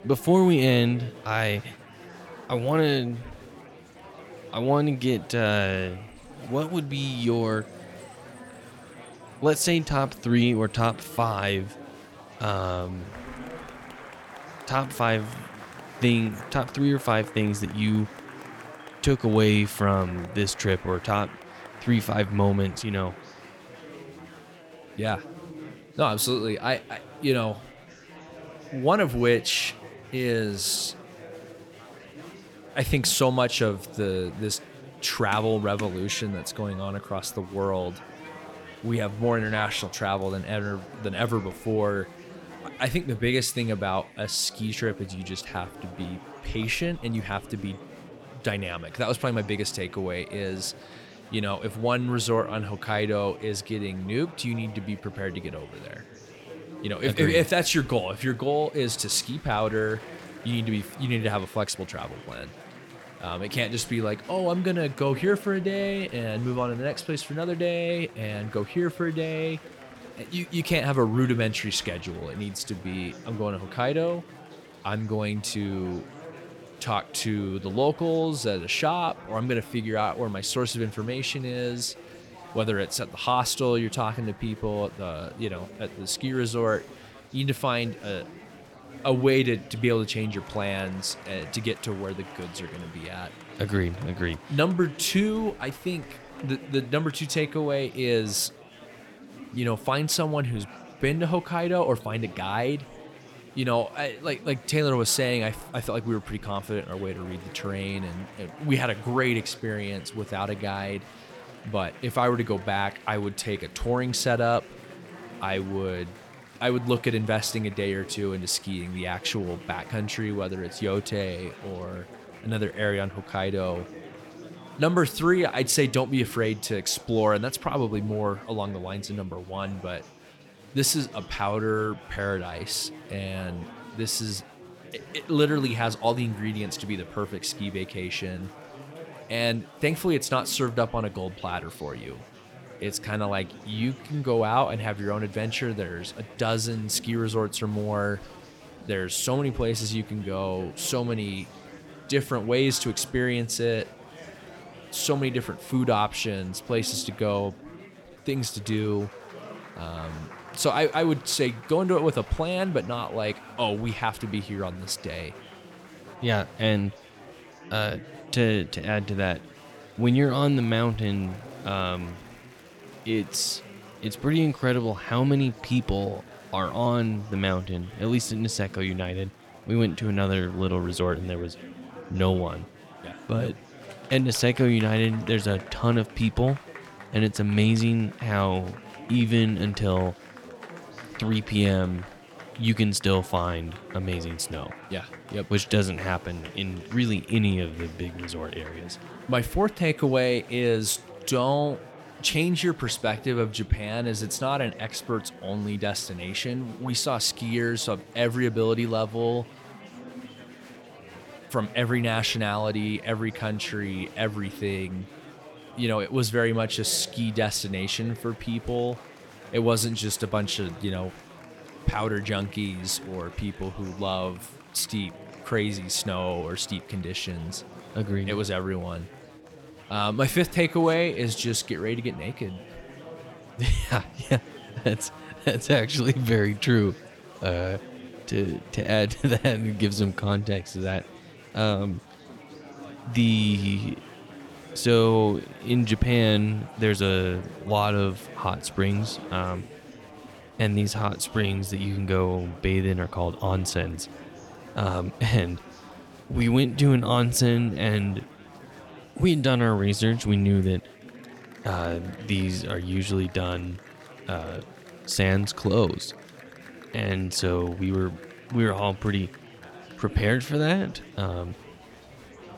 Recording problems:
murmuring crowd; noticeable; throughout; 20 dB below the speech

